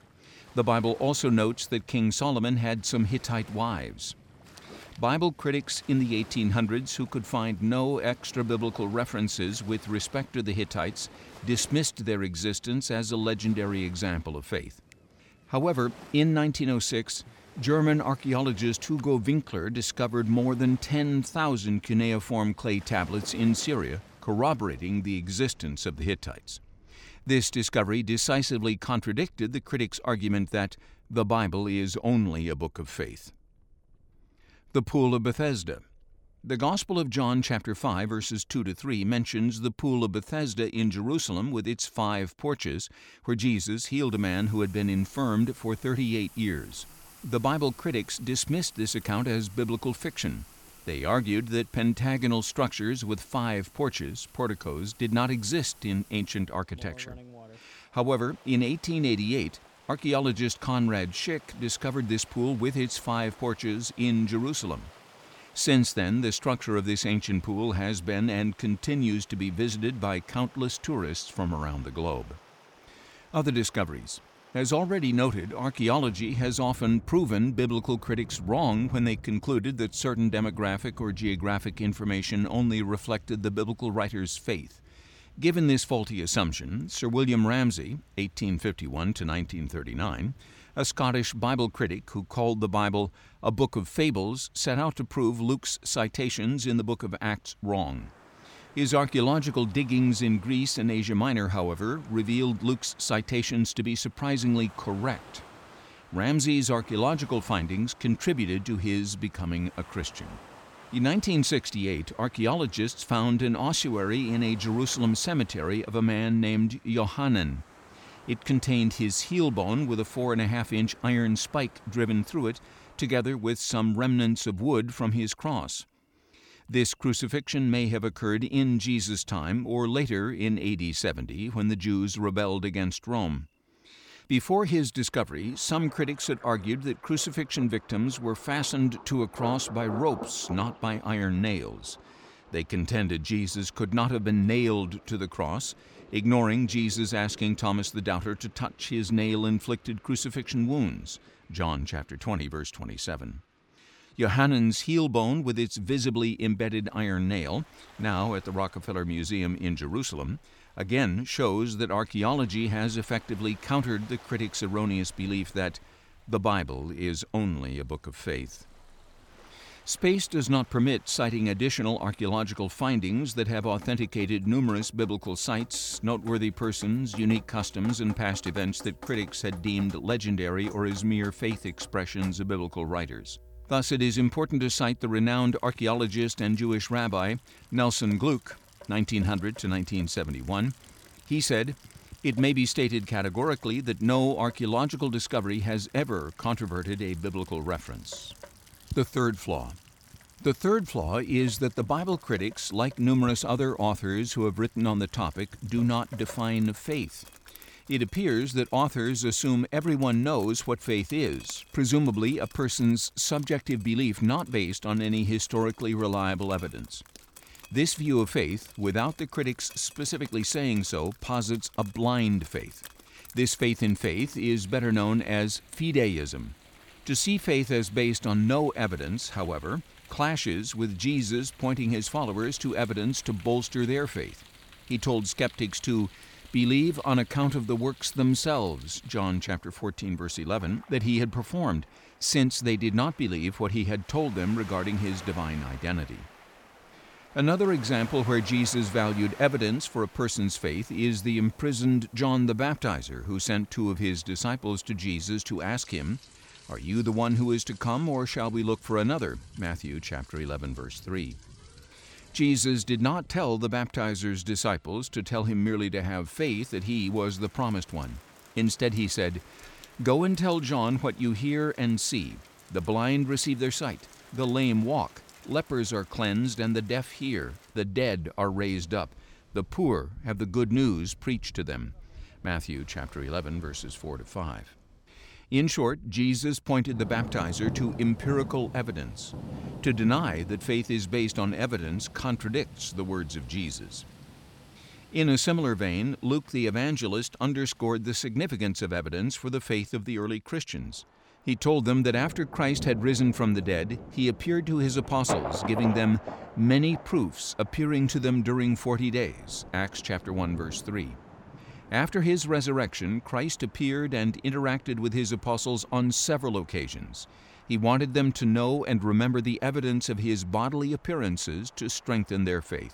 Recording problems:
rain or running water; faint; throughout; 20 dB below the speech

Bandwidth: 18.5 kHz